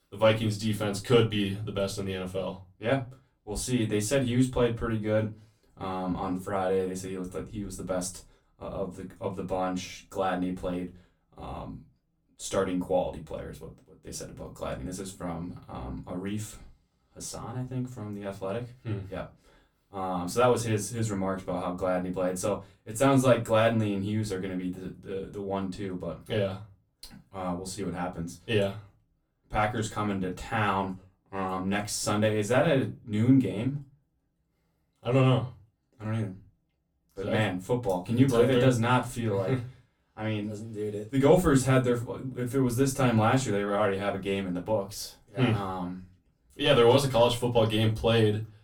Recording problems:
off-mic speech; far
room echo; very slight; dies away in 0.2 s

